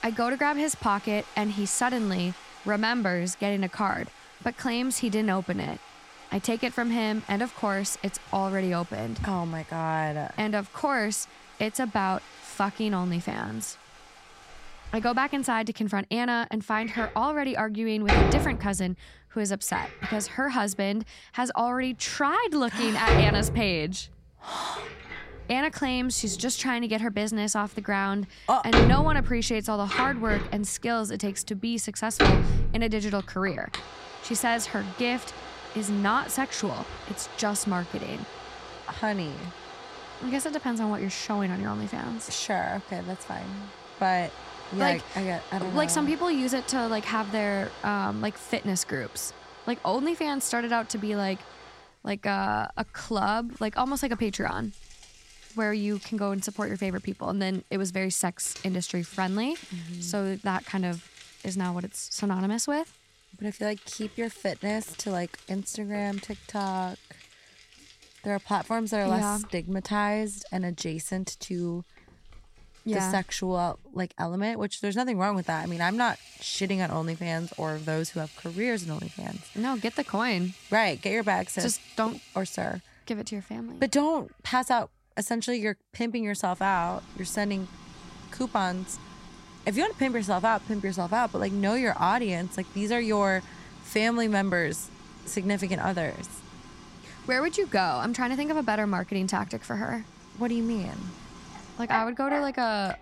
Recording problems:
household noises; loud; throughout; 7 dB below the speech

